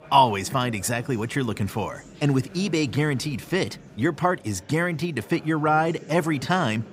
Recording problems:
murmuring crowd; noticeable; throughout; 20 dB below the speech

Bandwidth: 15.5 kHz